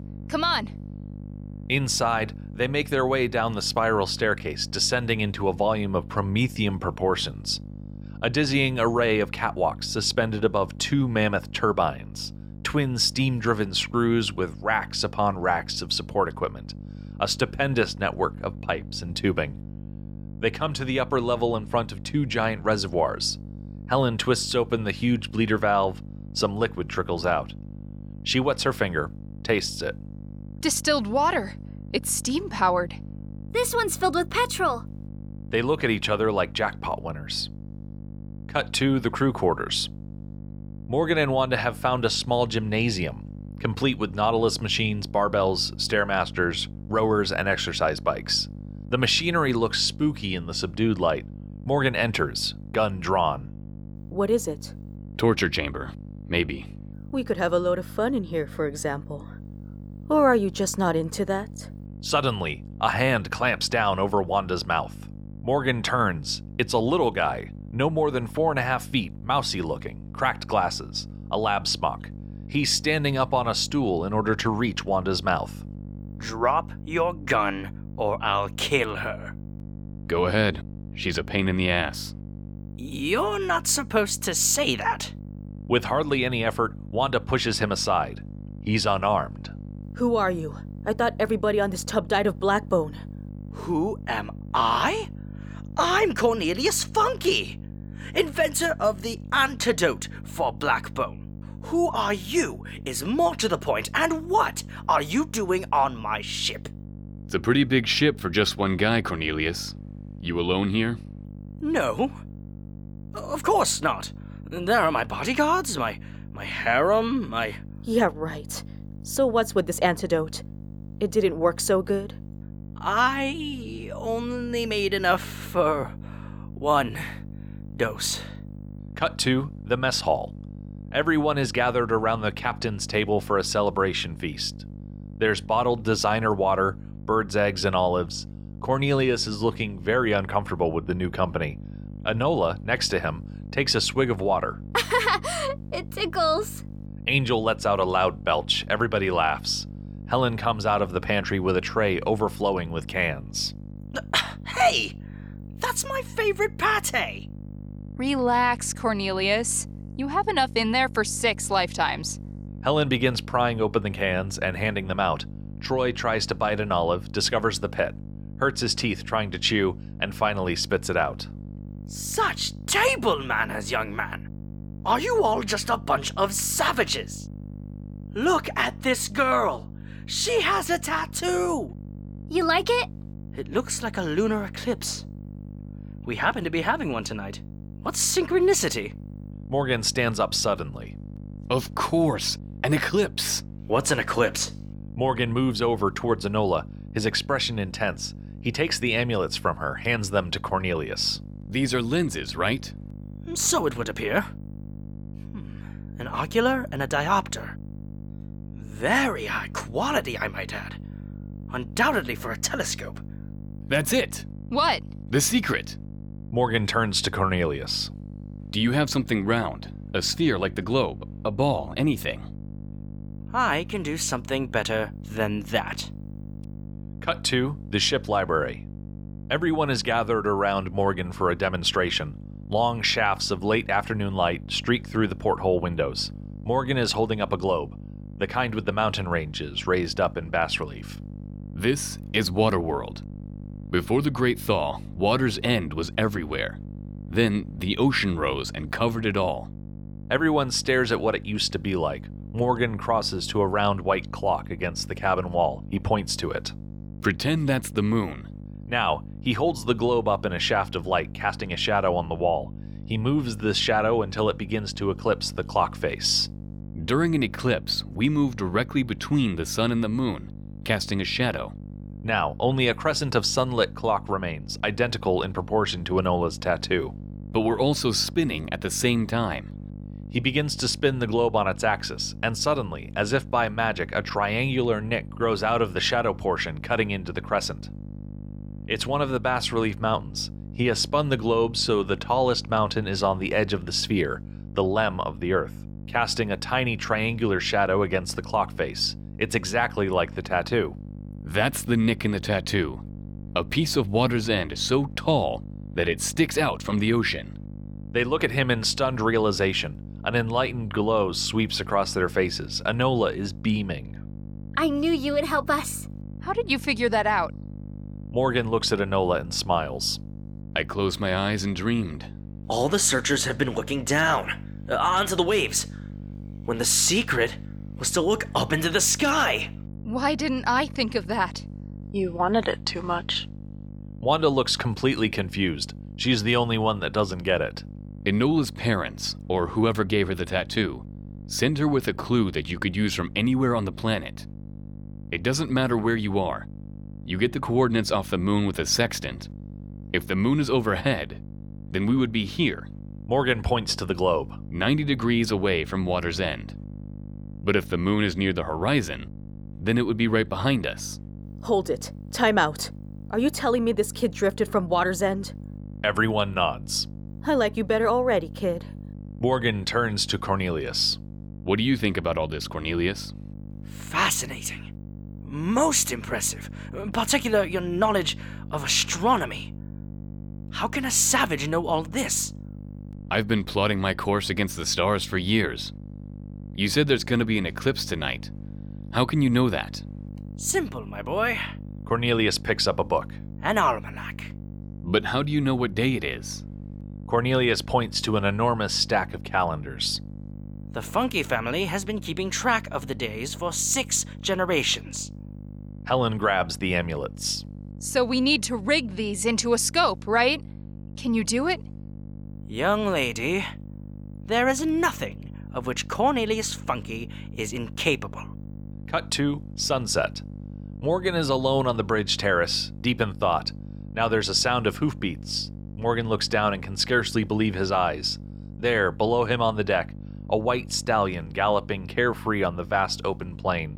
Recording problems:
electrical hum; faint; throughout; 50 Hz, 25 dB below the speech

